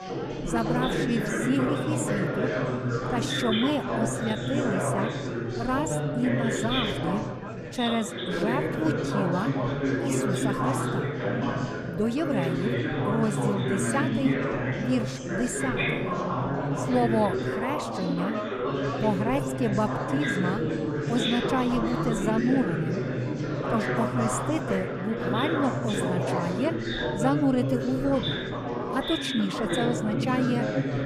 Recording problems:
chatter from many people; very loud; throughout; 1 dB above the speech

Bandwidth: 15 kHz